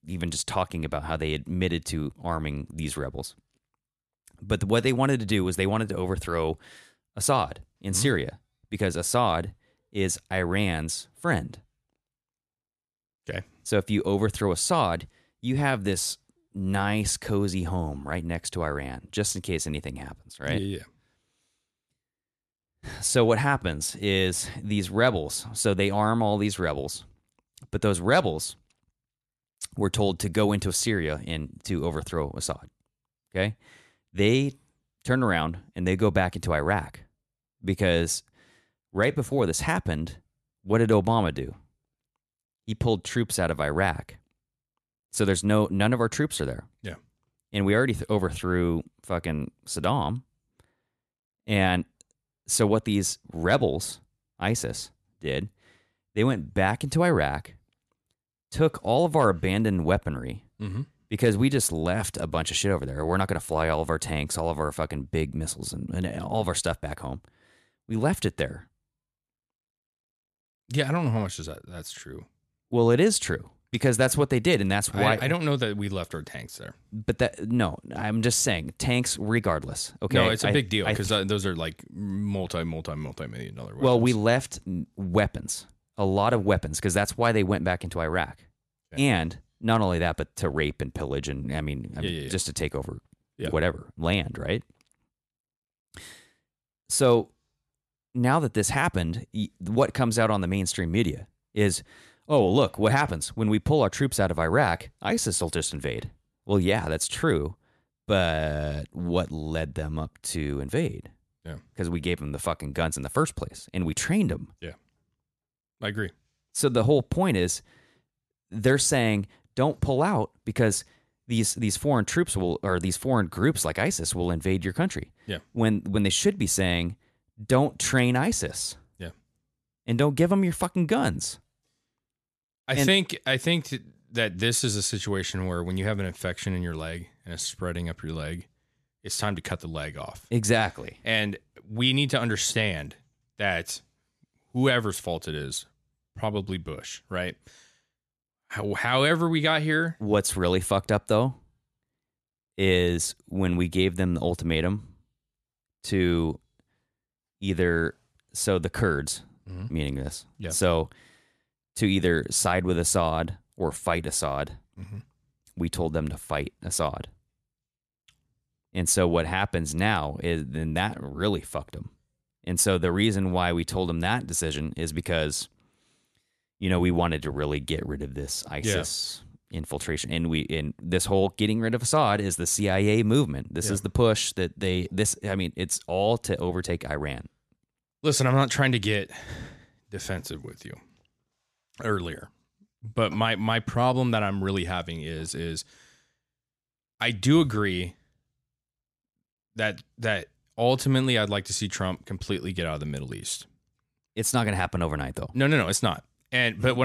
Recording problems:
abrupt cut into speech; at the end

